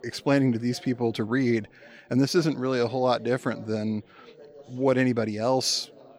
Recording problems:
background chatter; faint; throughout; 4 voices, 25 dB below the speech

